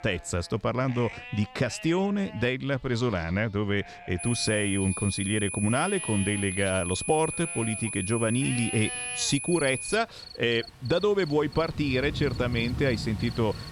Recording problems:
high-pitched whine; loud; from 4 to 10 s; 10 kHz, 5 dB below the speech
animal sounds; noticeable; throughout; 15 dB below the speech
rain or running water; noticeable; throughout; 10 dB below the speech

